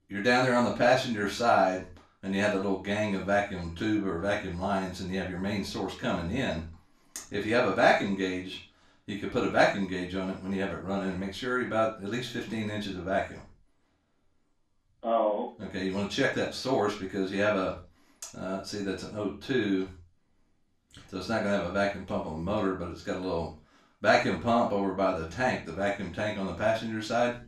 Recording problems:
off-mic speech; far
room echo; noticeable; dies away in 0.3 s

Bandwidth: 14 kHz